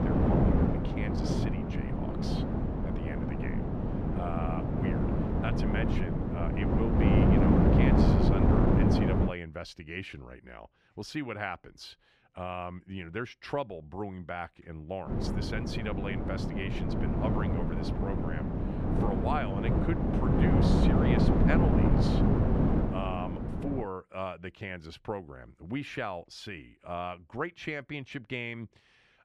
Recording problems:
wind noise on the microphone; heavy; until 9.5 s and from 15 to 24 s; 4 dB above the speech

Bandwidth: 14.5 kHz